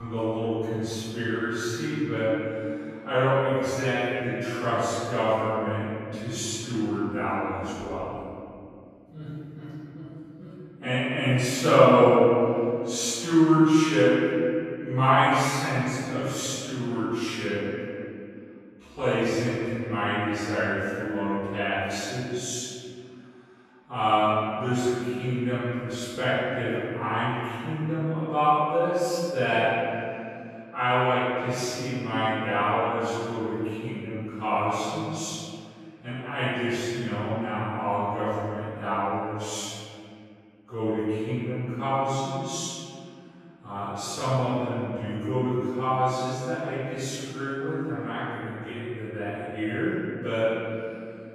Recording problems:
room echo; strong; dies away in 2.7 s
off-mic speech; far
wrong speed, natural pitch; too slow; 0.5 times normal speed
abrupt cut into speech; at the start

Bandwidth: 14.5 kHz